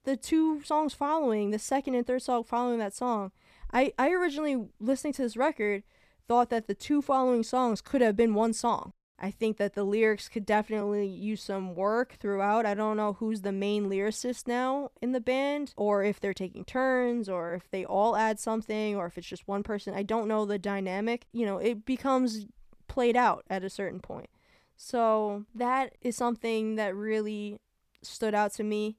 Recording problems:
uneven, jittery; slightly; from 0.5 to 26 s

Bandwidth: 14.5 kHz